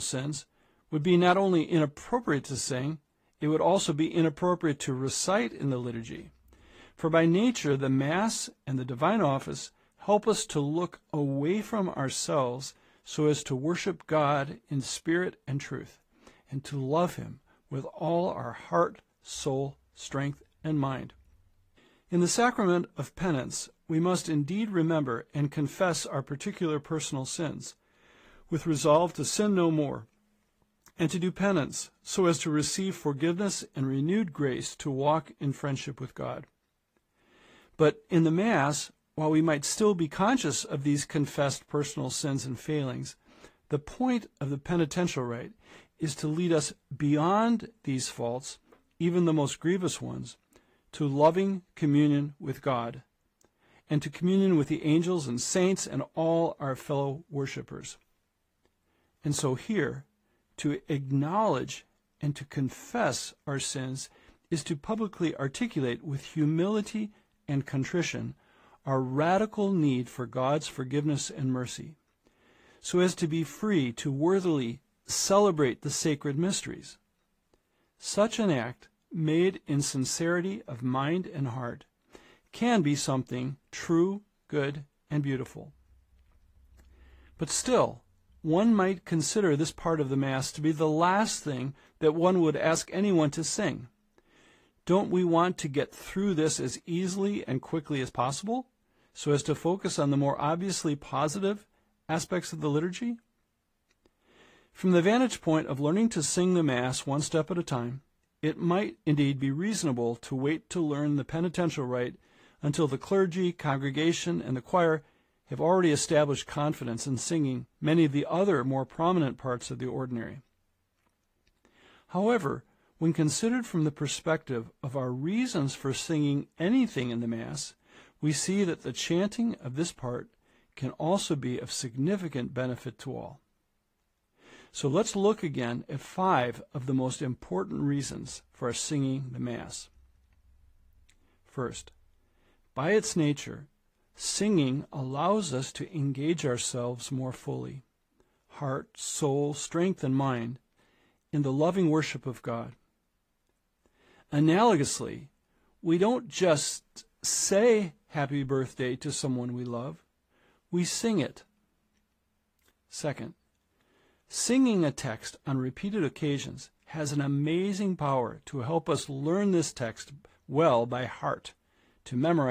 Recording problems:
garbled, watery; slightly; nothing above 15 kHz
abrupt cut into speech; at the start and the end

